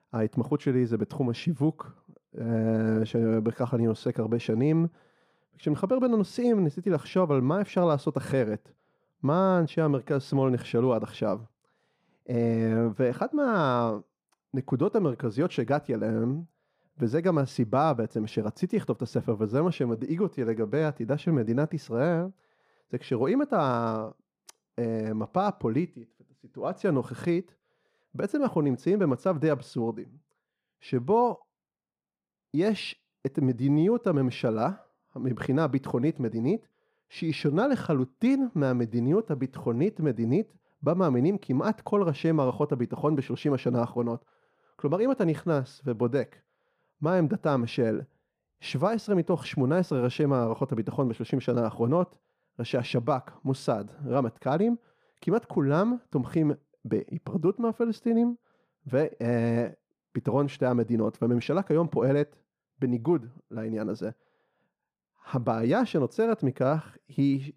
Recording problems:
muffled; slightly; fading above 1.5 kHz

